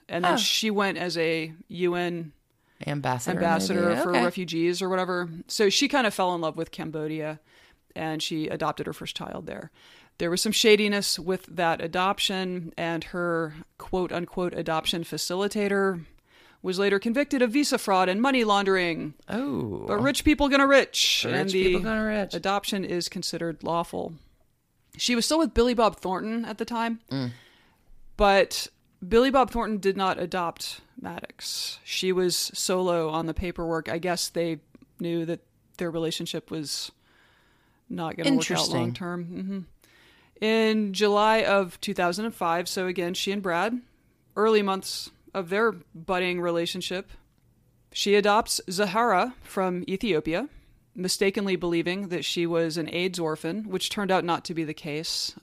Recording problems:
none

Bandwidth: 15 kHz